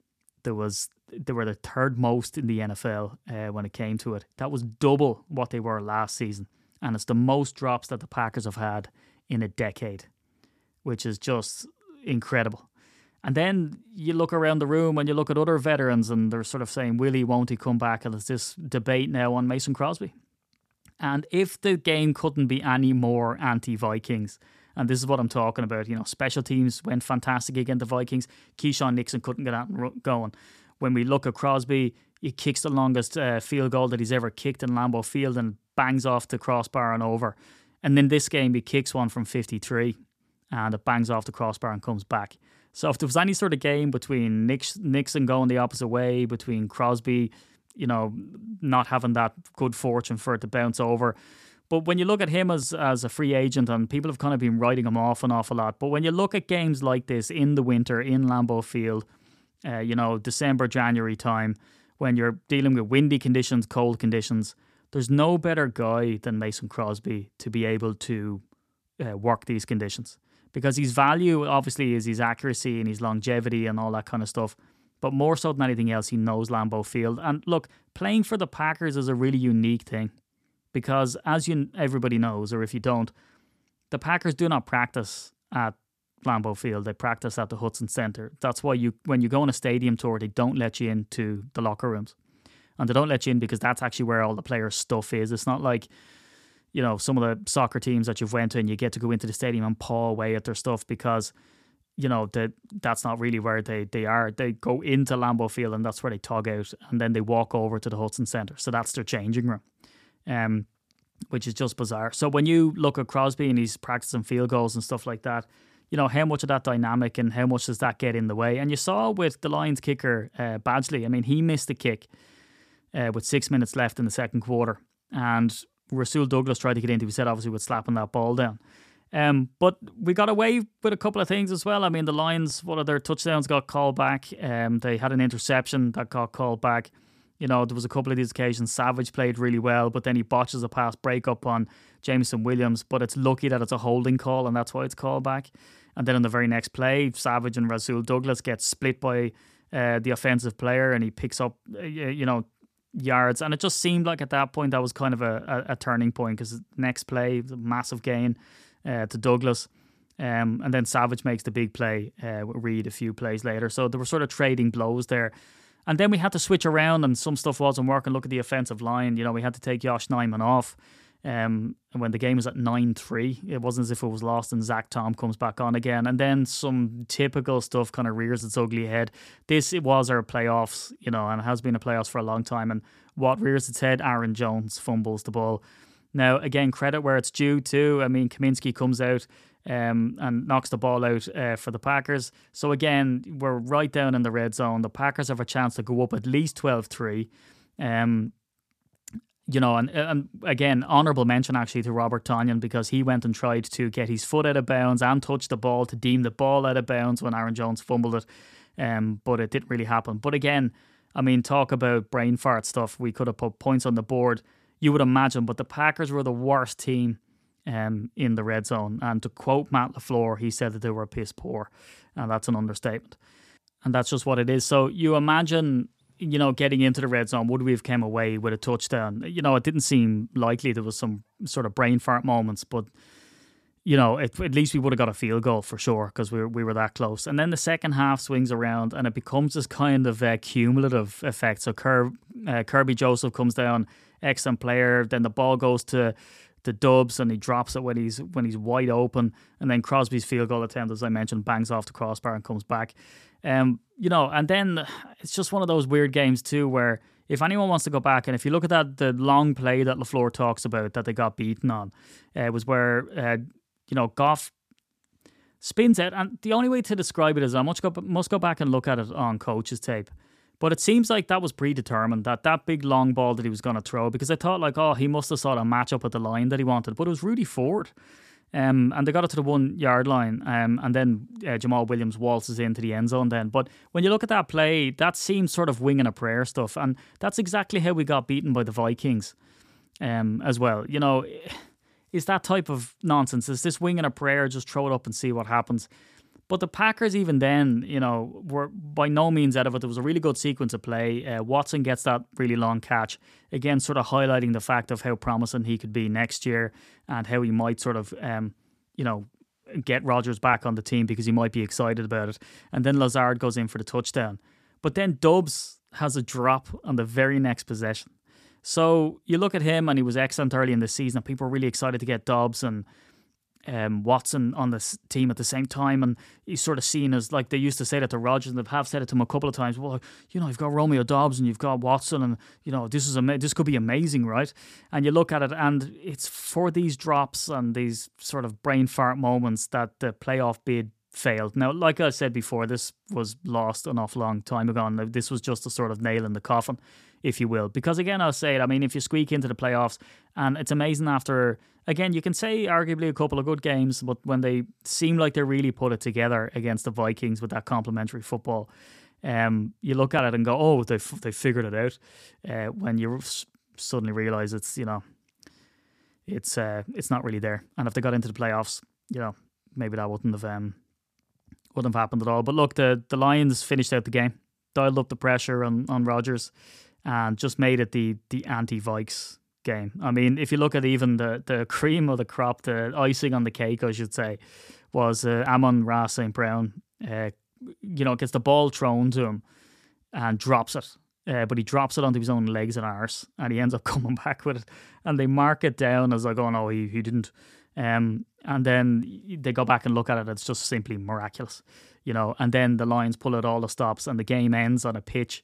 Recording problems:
none

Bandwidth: 14.5 kHz